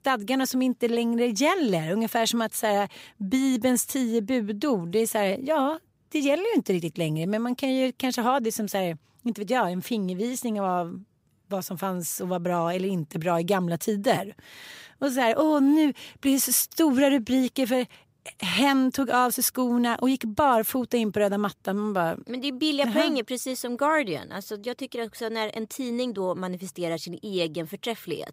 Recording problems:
none

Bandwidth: 15.5 kHz